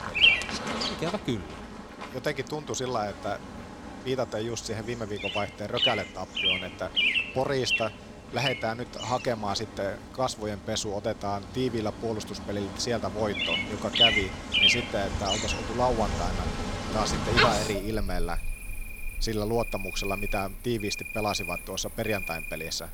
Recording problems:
animal sounds; very loud; throughout; 4 dB above the speech

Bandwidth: 18.5 kHz